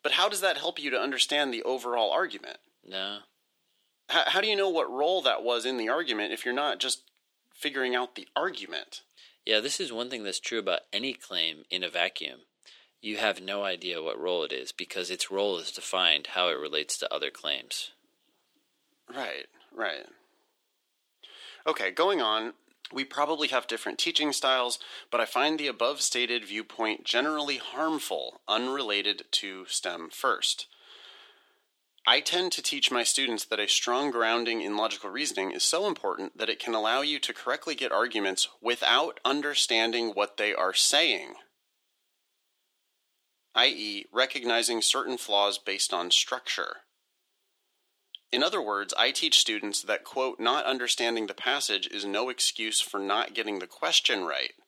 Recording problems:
thin; somewhat; fading below 350 Hz

